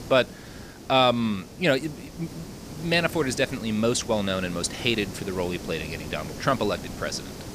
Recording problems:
hiss; noticeable; throughout; 15 dB below the speech

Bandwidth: 15 kHz